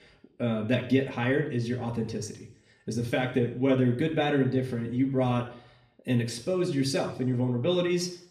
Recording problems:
room echo; slight; dies away in 0.6 s
off-mic speech; somewhat distant

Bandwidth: 14.5 kHz